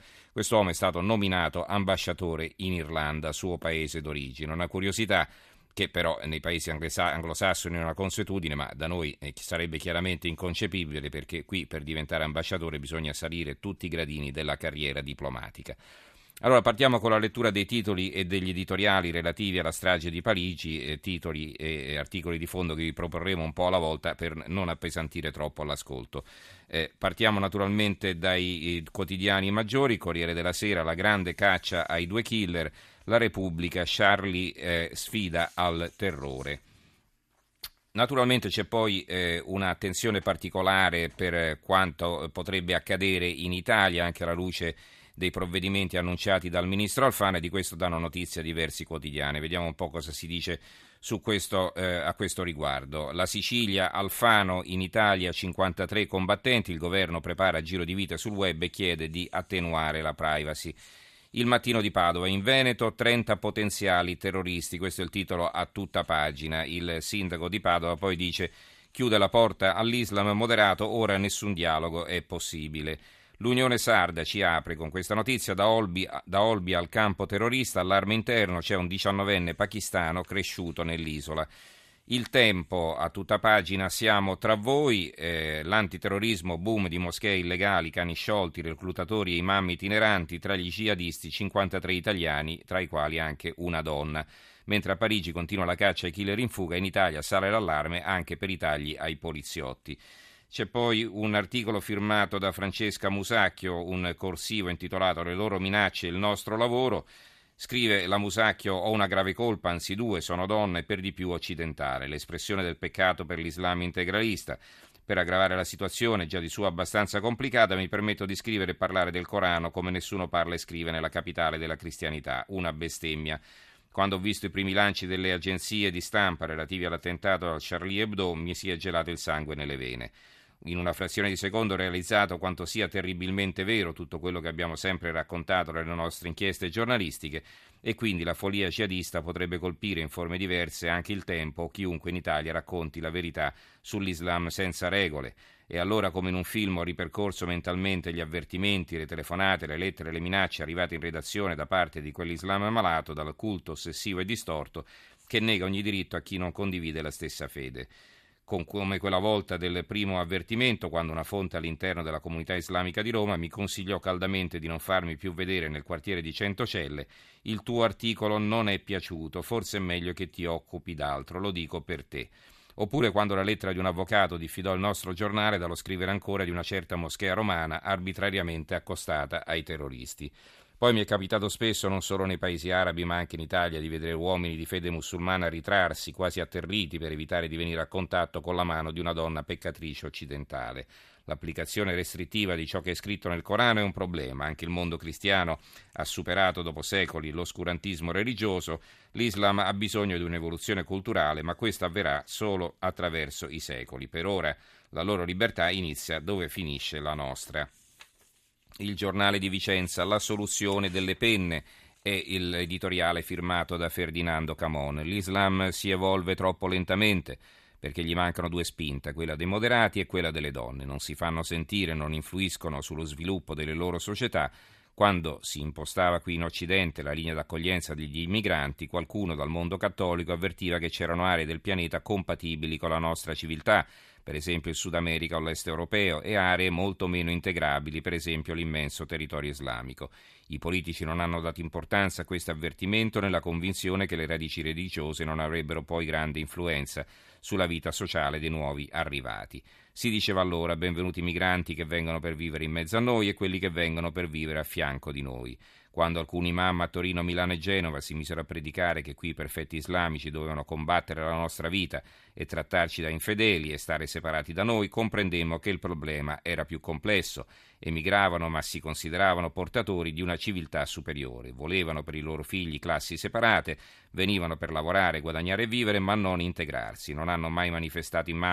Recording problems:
abrupt cut into speech; at the end

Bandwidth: 14 kHz